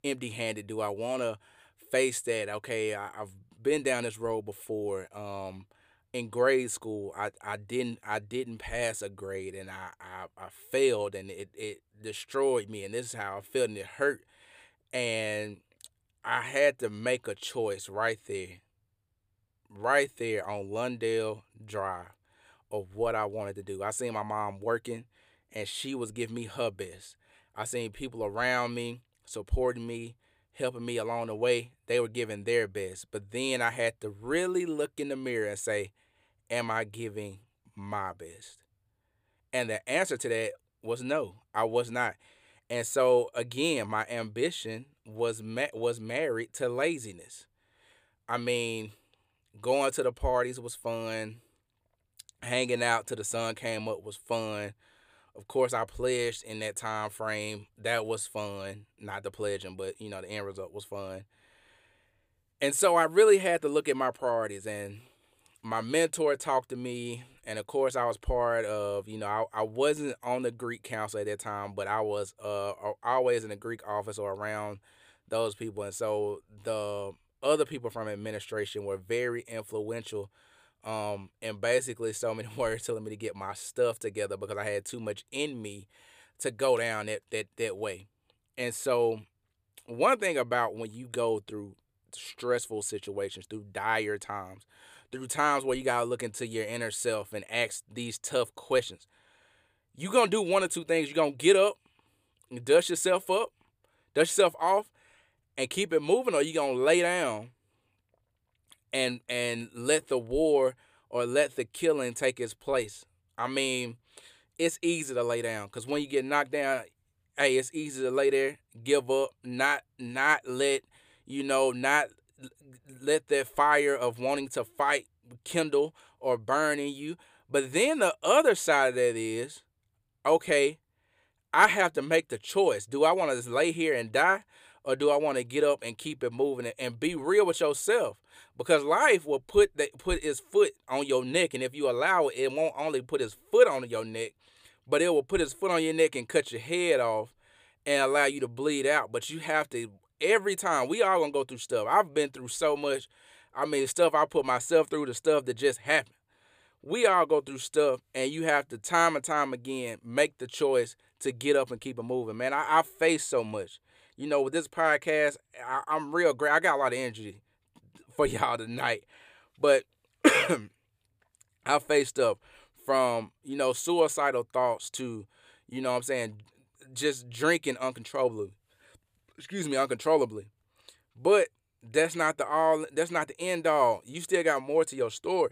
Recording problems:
none

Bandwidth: 15 kHz